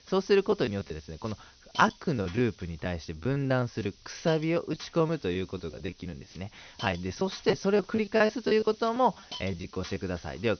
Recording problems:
high frequencies cut off; noticeable; nothing above 6 kHz
hiss; noticeable; throughout; 20 dB below the speech
choppy; very; from 0.5 to 4 s, from 4.5 to 6 s and from 7 to 10 s; 14% of the speech affected

